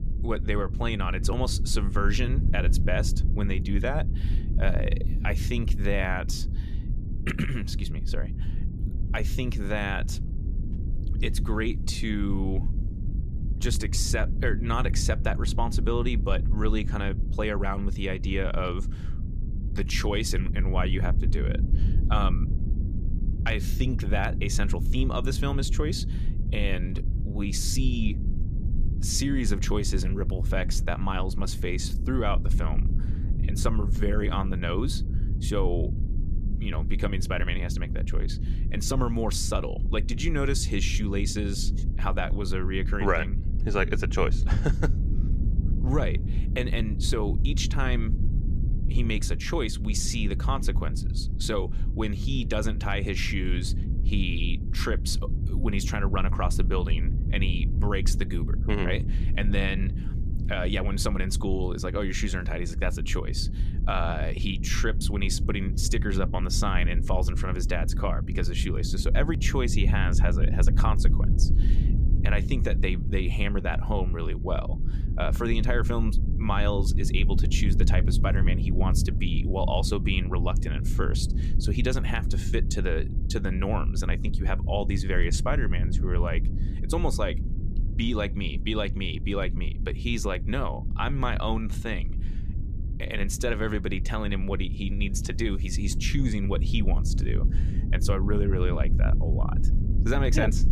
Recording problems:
low rumble; noticeable; throughout; 10 dB below the speech

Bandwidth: 14.5 kHz